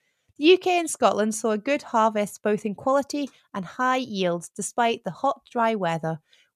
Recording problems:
none

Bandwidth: 14.5 kHz